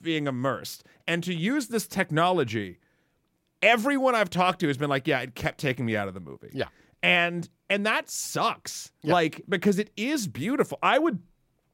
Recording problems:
none

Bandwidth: 16 kHz